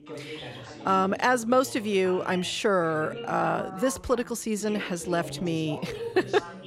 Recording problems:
background chatter; noticeable; throughout; 2 voices, 15 dB below the speech

